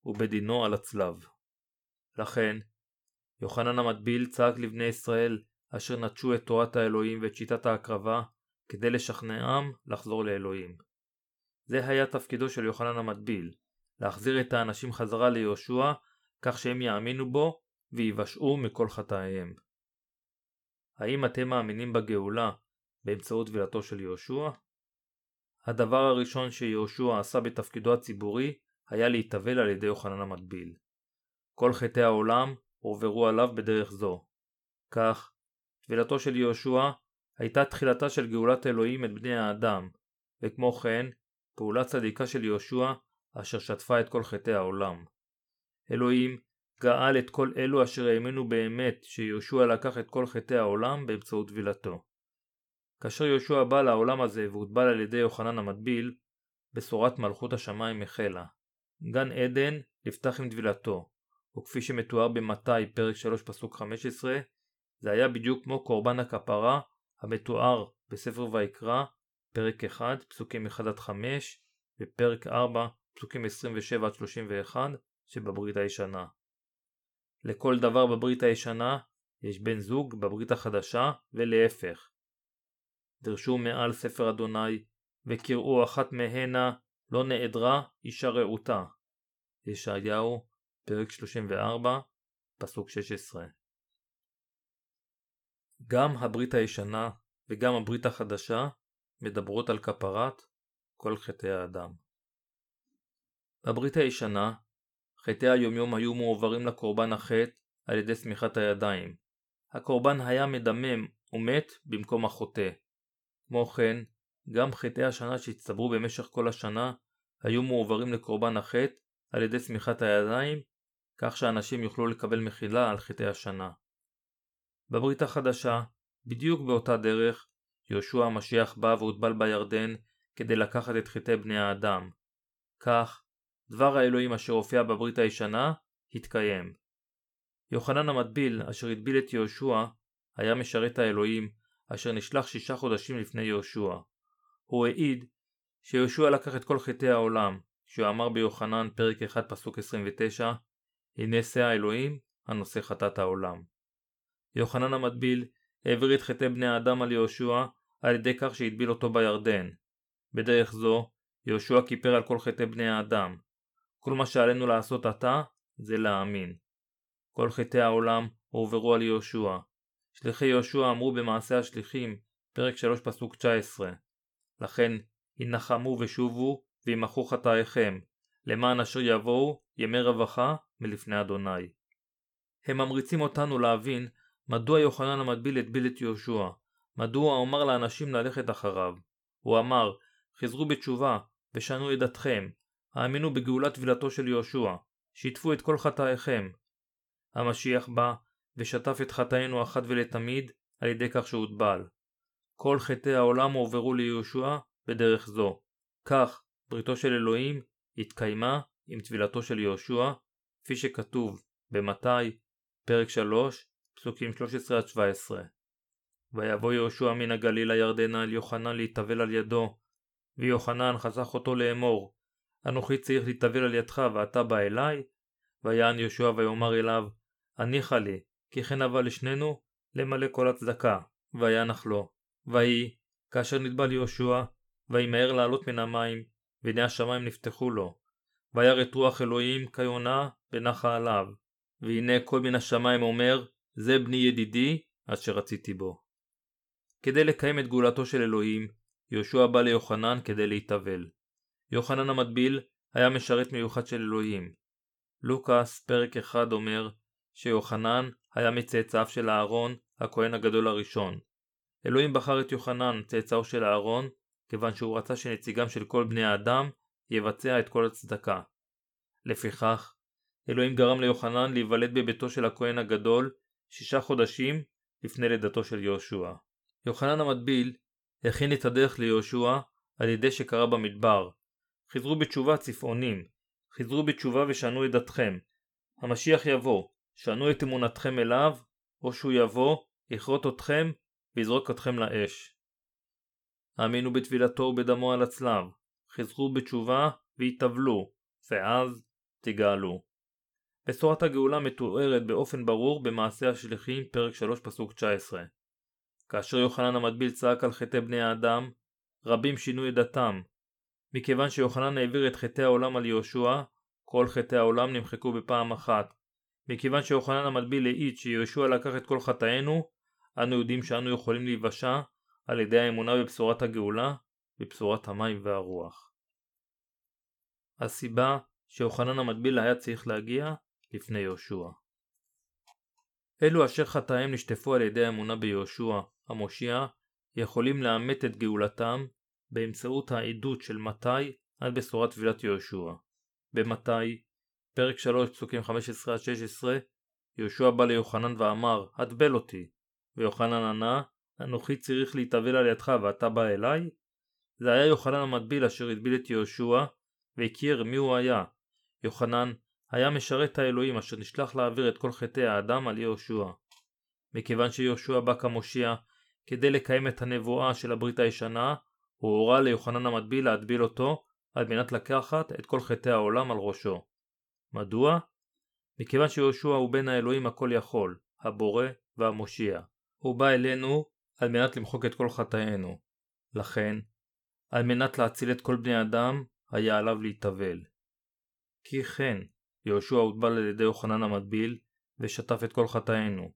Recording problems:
none

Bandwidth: 18.5 kHz